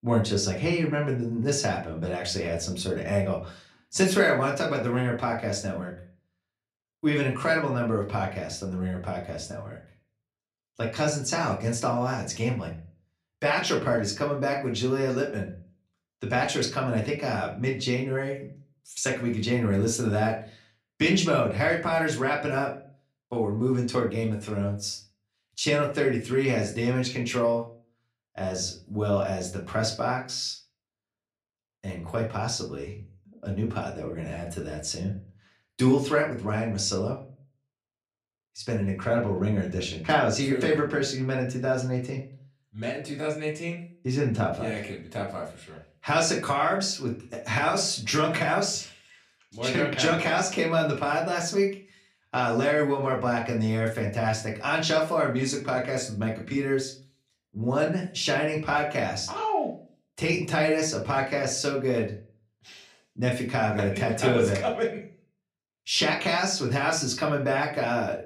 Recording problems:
off-mic speech; far
room echo; very slight; dies away in 0.3 s

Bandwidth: 15 kHz